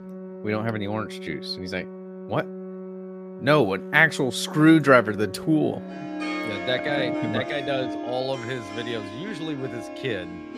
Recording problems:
background music; noticeable; throughout; 10 dB below the speech

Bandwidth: 15 kHz